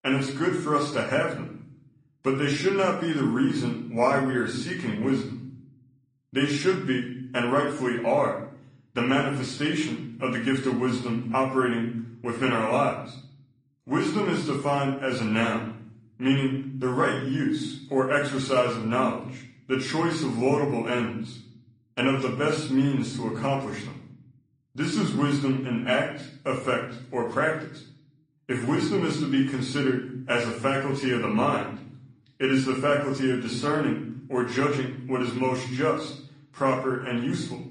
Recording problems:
room echo; slight; dies away in 0.7 s
off-mic speech; somewhat distant
garbled, watery; slightly; nothing above 10 kHz

